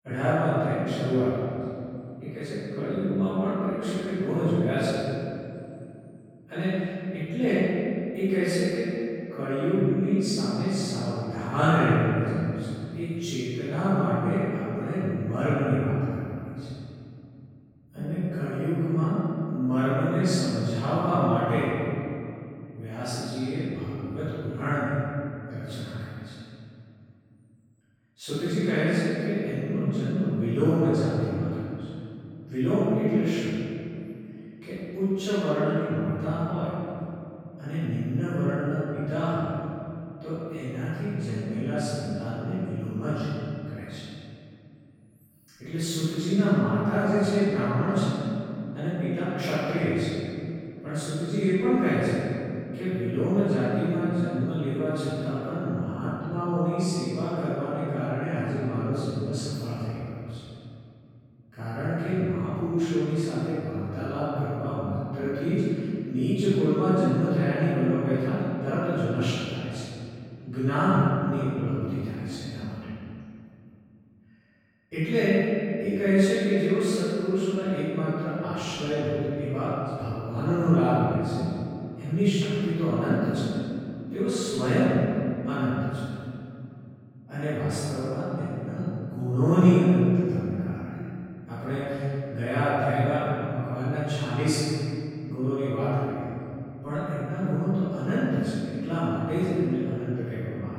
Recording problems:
room echo; strong; dies away in 2.6 s
off-mic speech; far

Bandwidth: 17.5 kHz